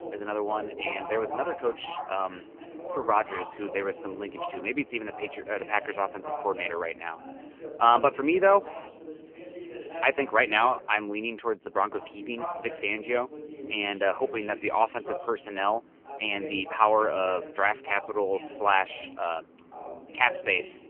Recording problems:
phone-call audio; poor line; nothing above 3 kHz
voice in the background; noticeable; throughout; 10 dB below the speech

